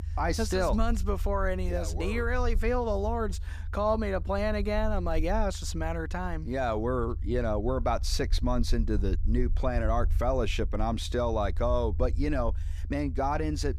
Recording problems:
low rumble; faint; throughout; 25 dB below the speech

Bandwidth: 15 kHz